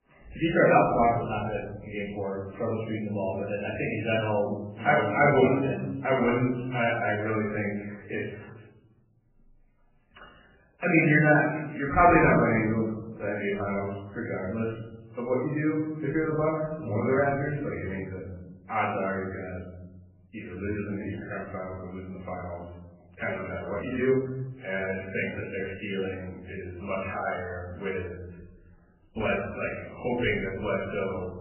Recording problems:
off-mic speech; far
garbled, watery; badly; nothing above 3 kHz
room echo; noticeable; dies away in 1 s

